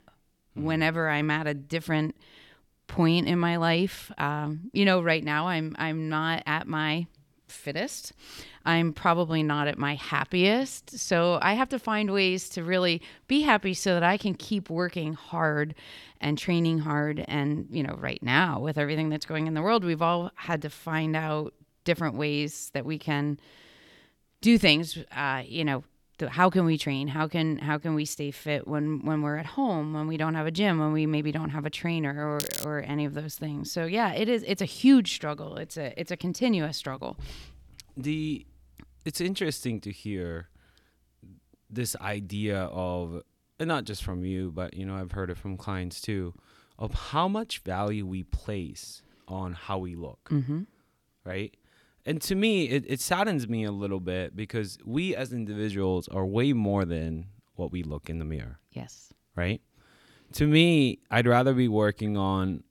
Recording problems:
crackling; loud; at 32 s; 7 dB below the speech

